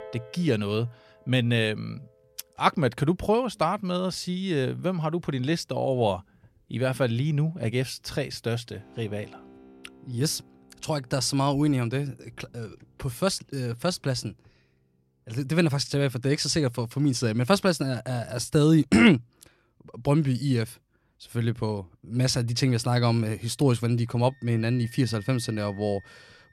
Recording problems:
background music; faint; throughout; 25 dB below the speech

